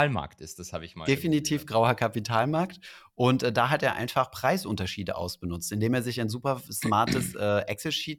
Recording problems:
abrupt cut into speech; at the start

